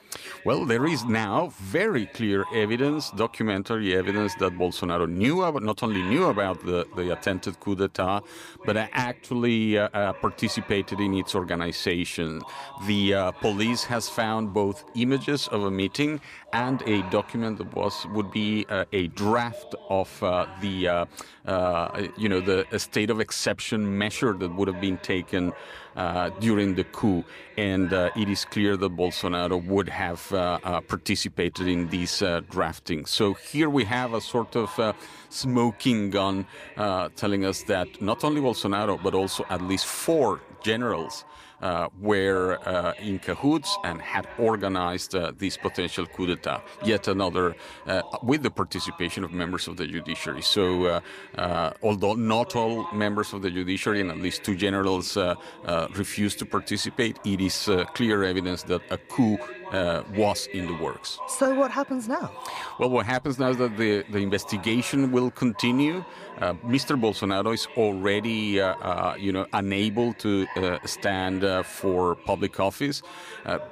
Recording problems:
voice in the background; noticeable; throughout; 15 dB below the speech

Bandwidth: 15 kHz